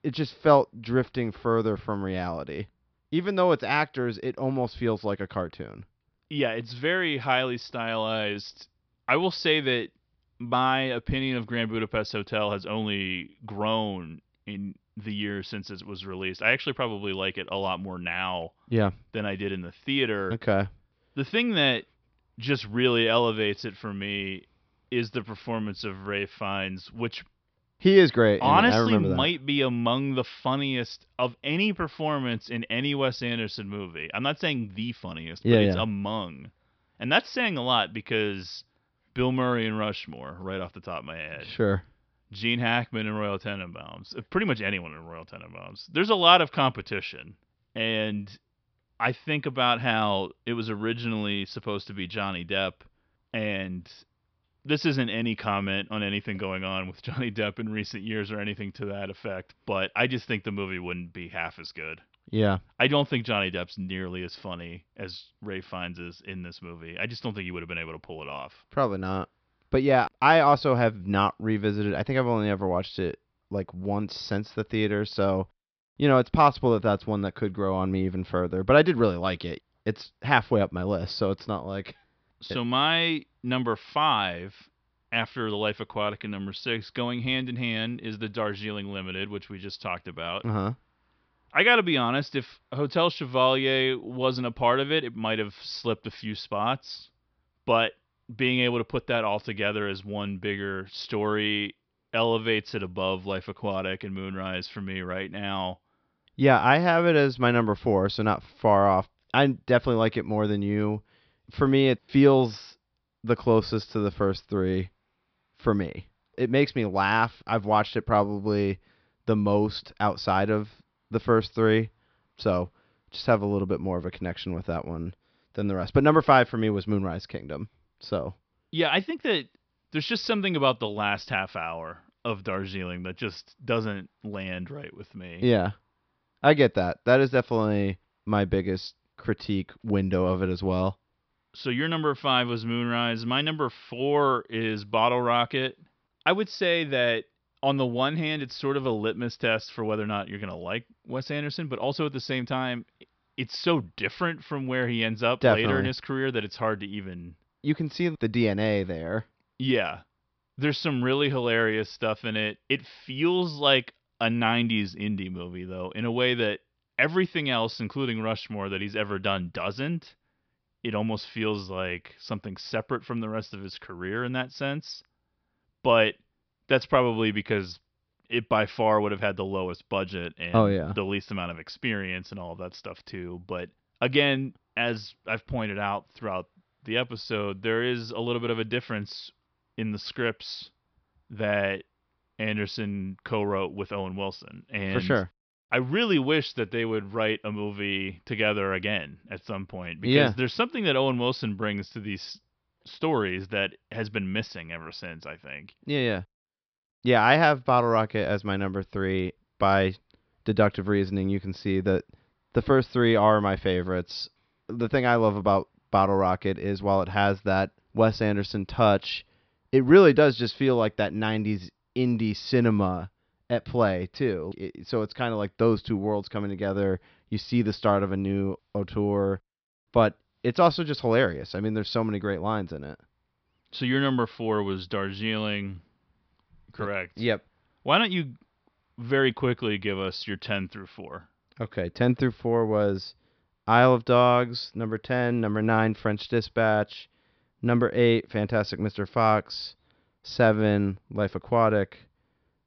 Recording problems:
high frequencies cut off; noticeable; nothing above 5.5 kHz

